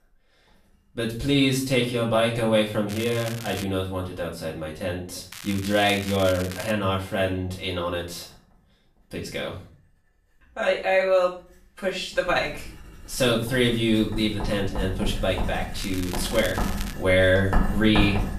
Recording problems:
off-mic speech; far
room echo; slight; dies away in 0.4 s
household noises; loud; throughout; 8 dB below the speech
crackling; noticeable; at 3 s, from 5.5 to 6.5 s and from 16 to 17 s; 15 dB below the speech

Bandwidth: 14.5 kHz